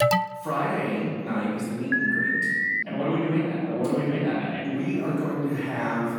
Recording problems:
room echo; strong; dies away in 1.9 s
off-mic speech; far
alarm; loud; at the start and at 2 s; peak 5 dB above the speech

